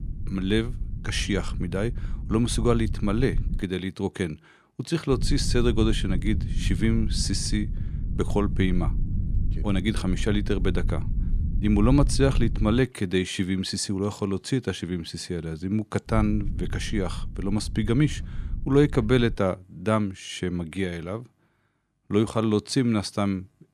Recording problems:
low rumble; noticeable; until 3.5 s, from 5 to 13 s and from 16 to 19 s; 15 dB below the speech

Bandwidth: 14 kHz